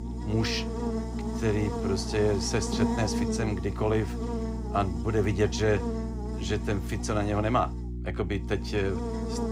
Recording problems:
electrical hum; loud; throughout; 60 Hz, 7 dB below the speech

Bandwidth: 15.5 kHz